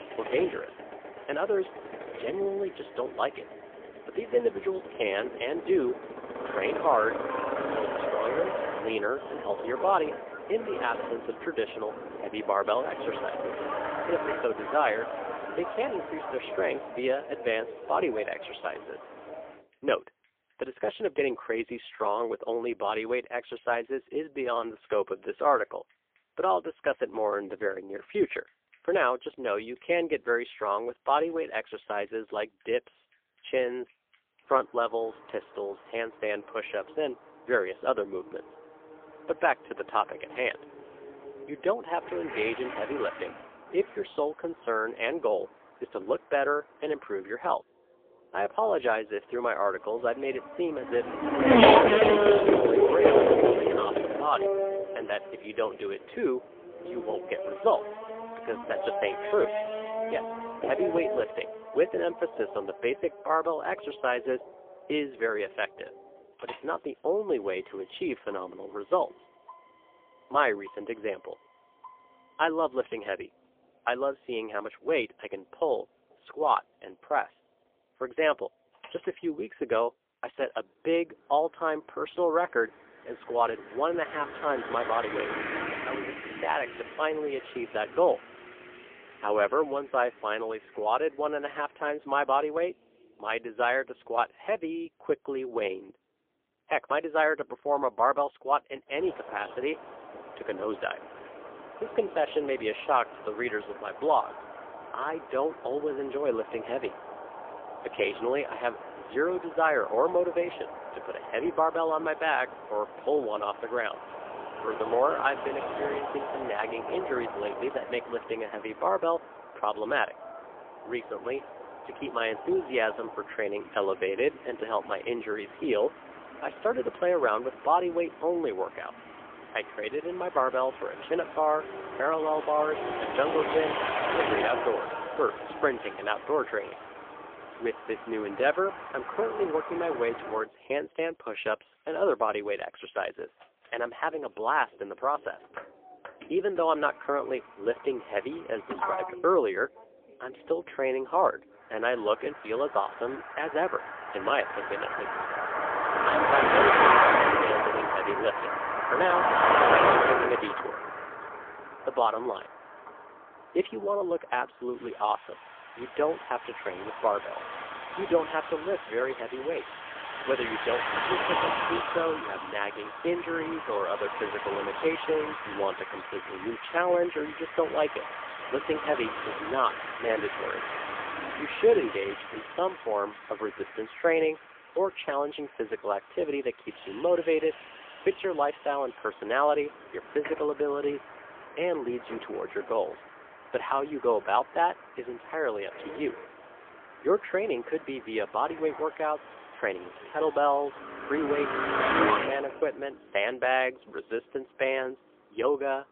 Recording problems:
phone-call audio; poor line; nothing above 3.5 kHz
traffic noise; loud; throughout; as loud as the speech

